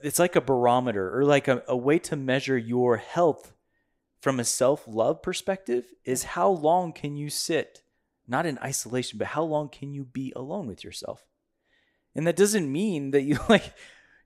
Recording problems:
none

